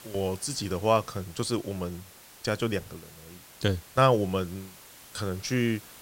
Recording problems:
hiss; noticeable; throughout; 20 dB below the speech

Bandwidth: 16 kHz